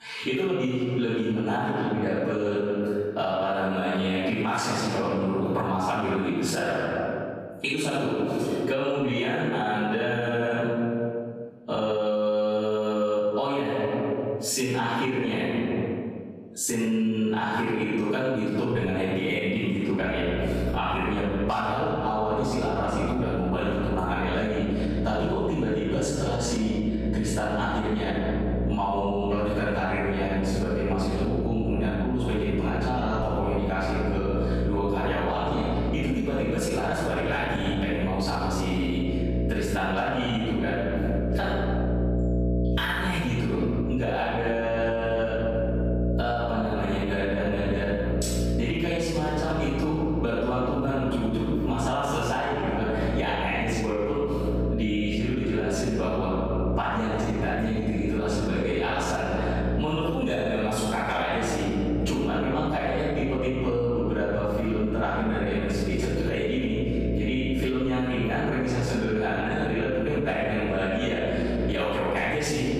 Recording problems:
room echo; strong; dies away in 1.5 s
off-mic speech; far
squashed, flat; somewhat
electrical hum; noticeable; from 20 s on; 60 Hz, 10 dB below the speech

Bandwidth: 14.5 kHz